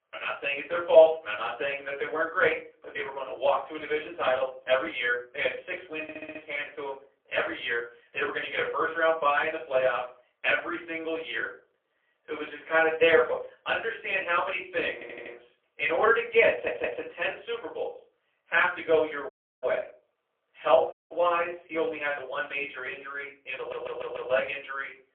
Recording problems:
phone-call audio; poor line; nothing above 3.5 kHz
off-mic speech; far
thin; very; fading below 300 Hz
room echo; slight; dies away in 0.3 s
audio stuttering; 4 times, first at 6 s
audio cutting out; at 19 s and at 21 s

